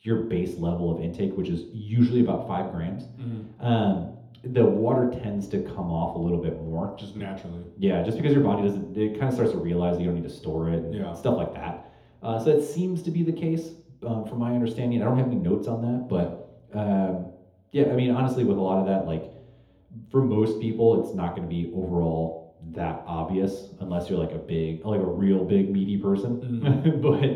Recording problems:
off-mic speech; far
room echo; noticeable; dies away in 0.7 s

